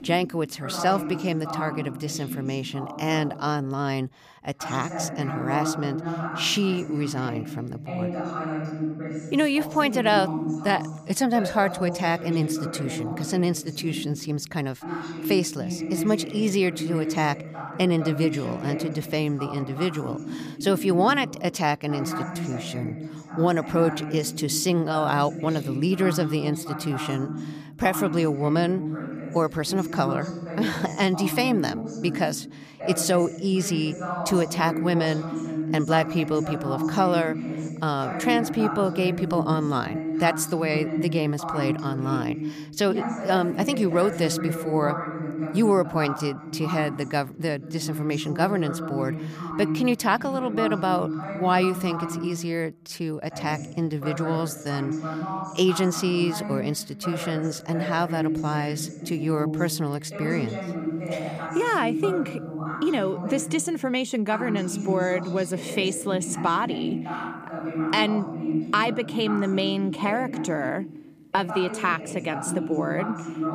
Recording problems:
voice in the background; loud; throughout; 6 dB below the speech

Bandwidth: 15 kHz